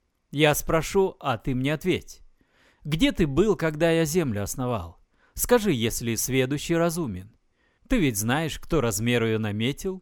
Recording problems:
none

